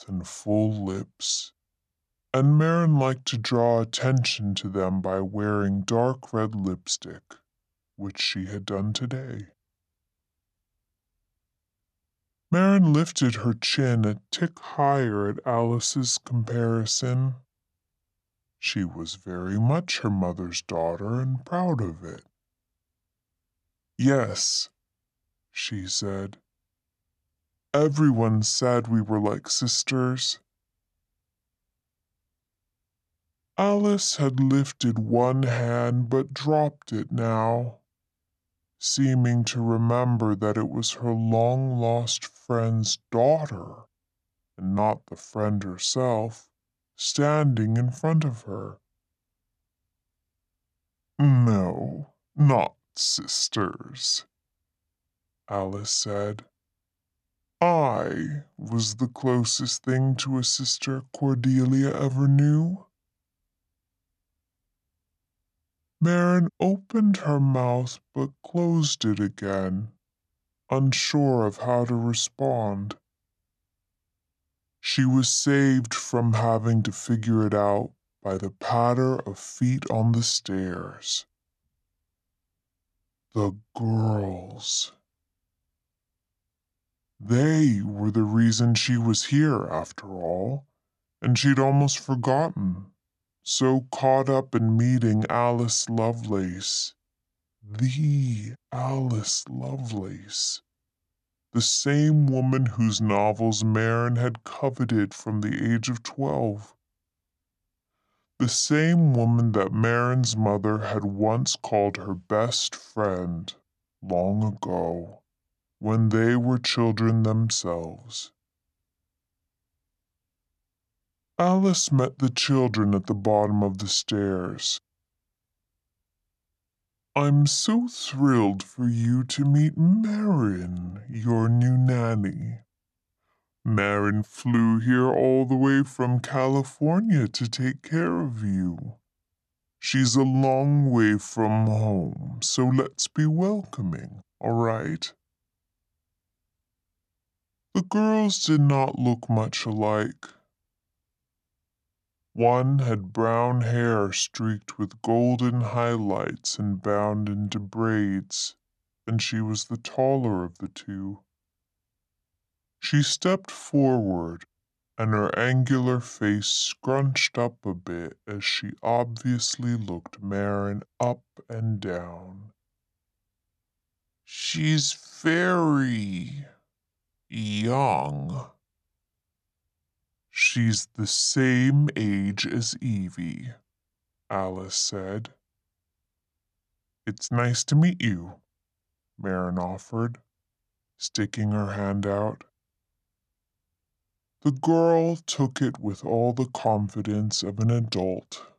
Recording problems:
wrong speed and pitch; too slow and too low; 0.7 times normal speed

